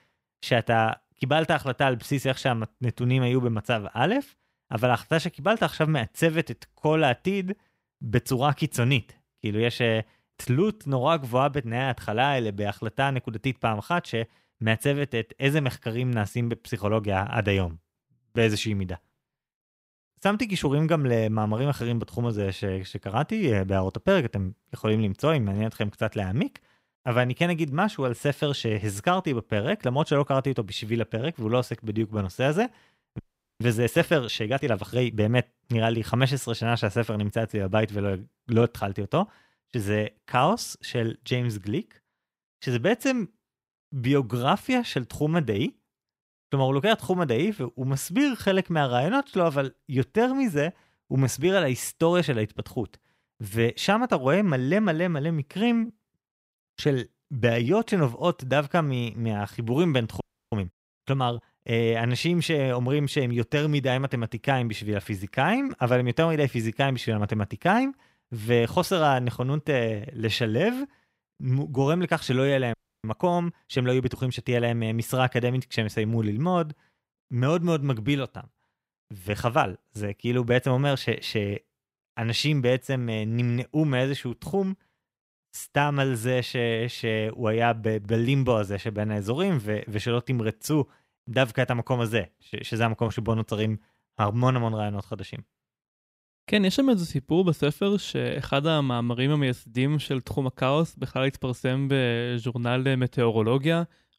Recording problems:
audio freezing; at 33 s, at 1:00 and at 1:13

